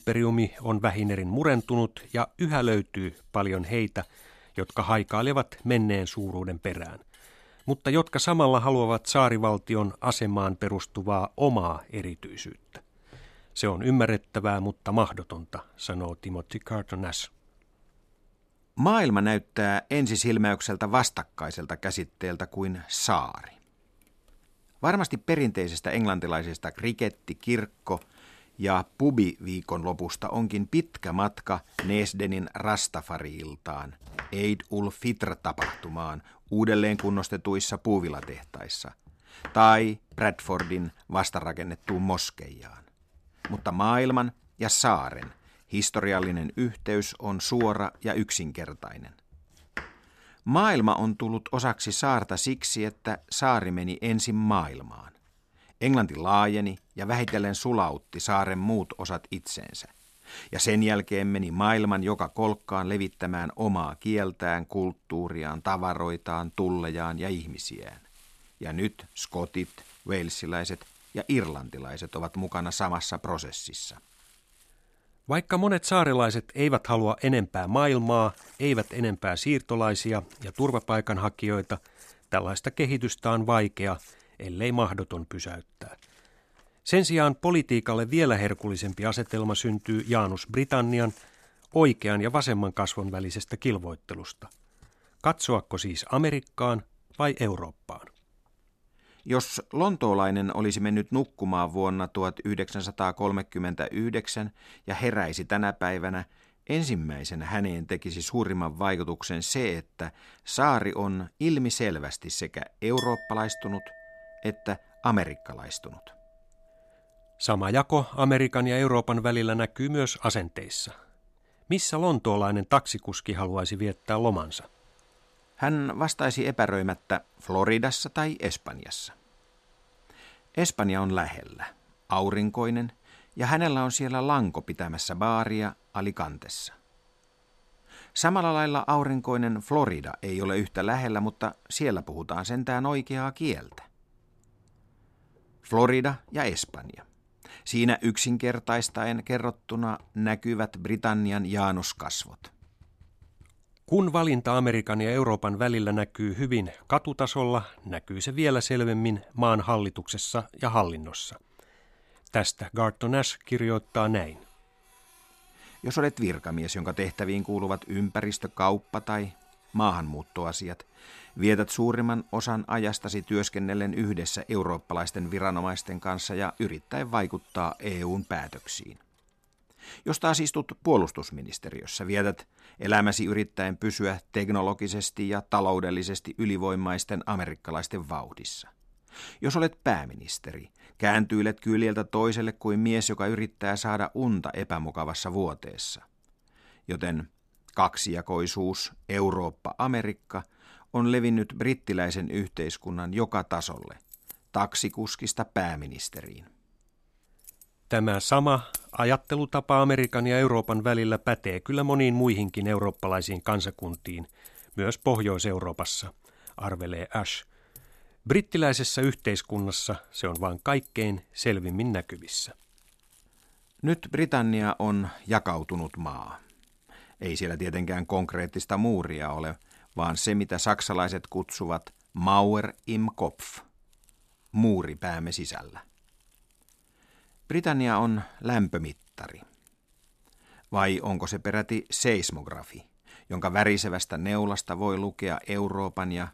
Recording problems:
household noises; faint; throughout; 20 dB below the speech

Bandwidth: 14.5 kHz